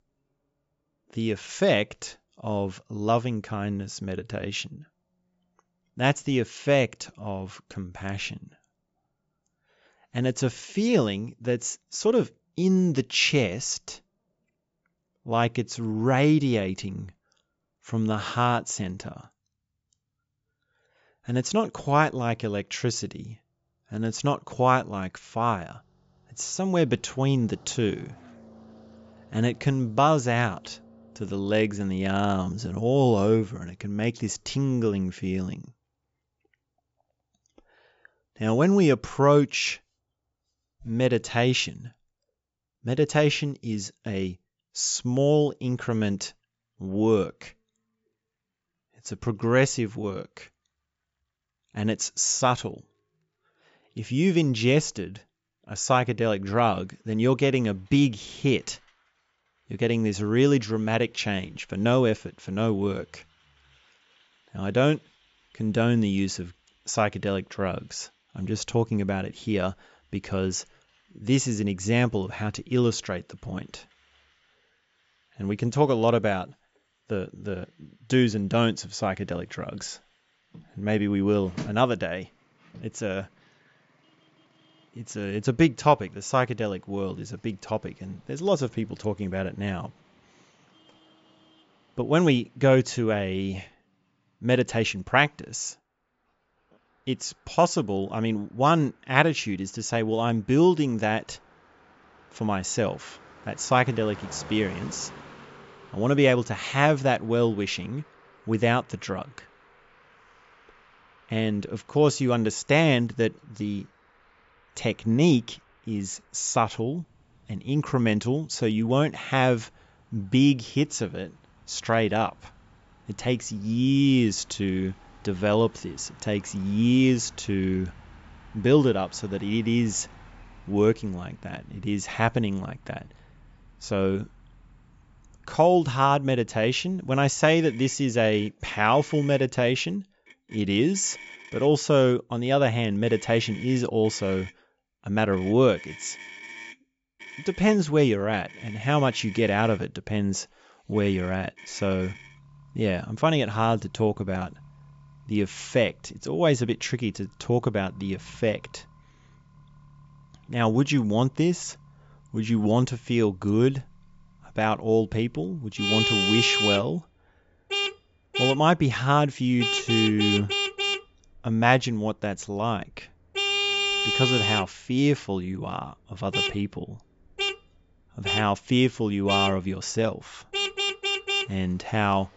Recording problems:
high frequencies cut off; noticeable; nothing above 8 kHz
traffic noise; loud; throughout; 4 dB below the speech

